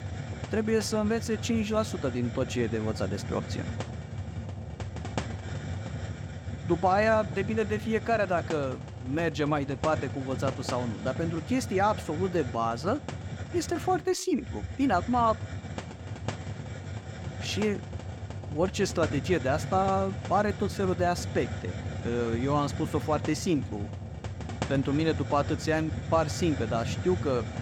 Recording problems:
hiss; loud; throughout; 8 dB below the speech

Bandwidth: 17 kHz